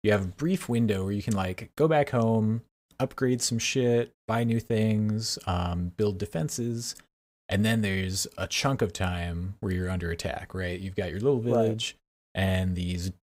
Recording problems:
none

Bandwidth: 15.5 kHz